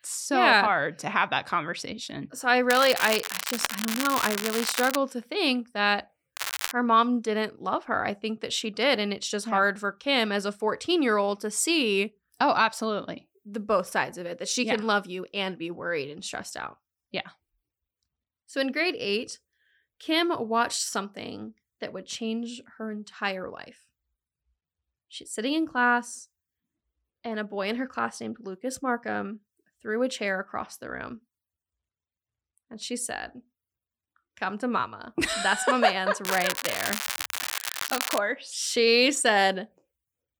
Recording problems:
crackling; loud; from 2.5 to 5 s, at 6.5 s and from 36 to 38 s; 4 dB below the speech

